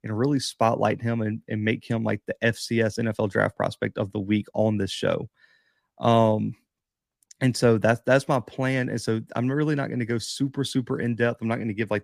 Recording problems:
none

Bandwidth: 15 kHz